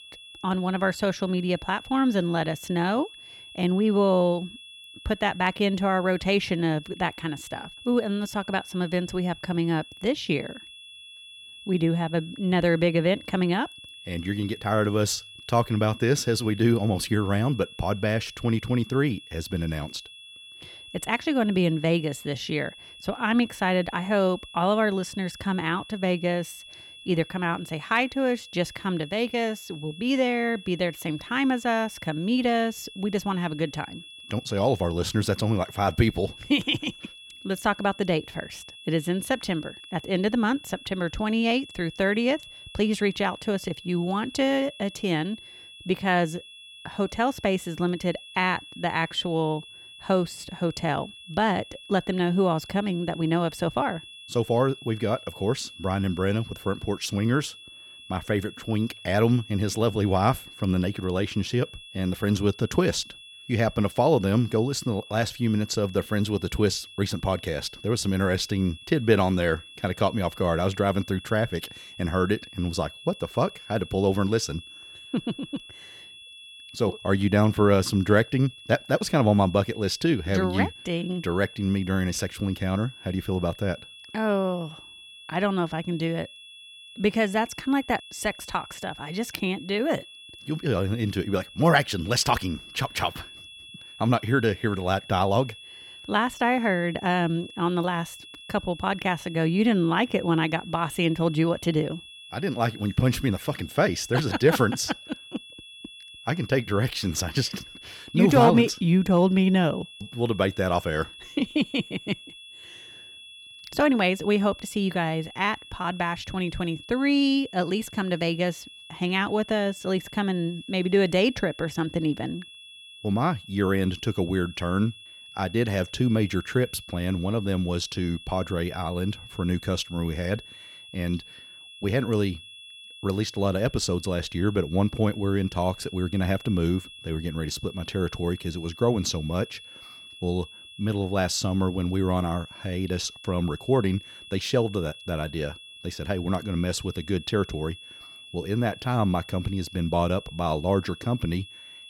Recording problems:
high-pitched whine; noticeable; throughout; 3.5 kHz, 15 dB below the speech

